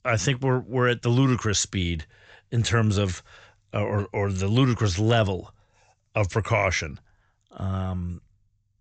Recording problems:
high frequencies cut off; noticeable; nothing above 8 kHz

